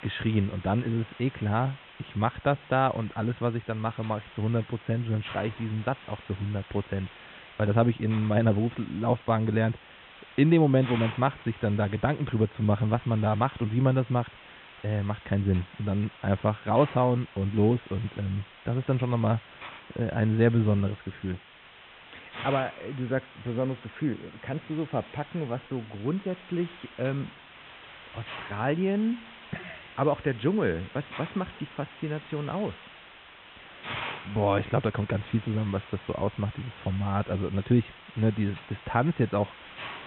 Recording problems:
high frequencies cut off; severe; nothing above 3.5 kHz
hiss; noticeable; throughout; 15 dB below the speech

